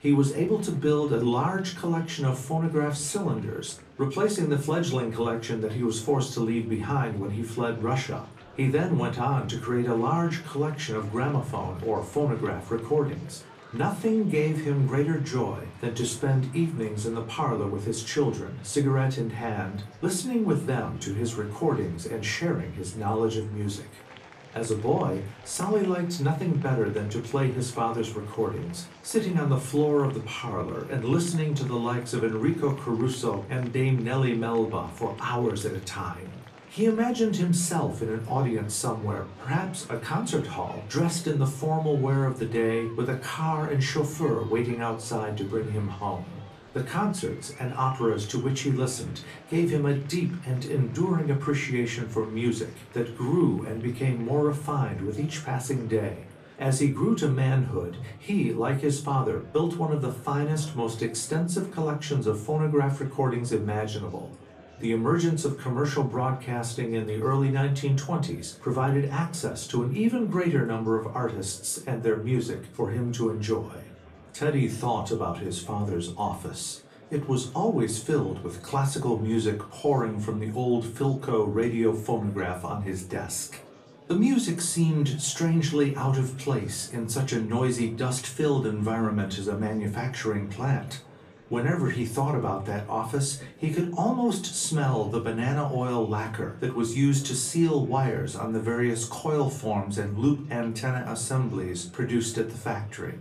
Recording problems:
off-mic speech; far
room echo; very slight; dies away in 0.3 s
murmuring crowd; faint; throughout; 20 dB below the speech

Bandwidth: 14.5 kHz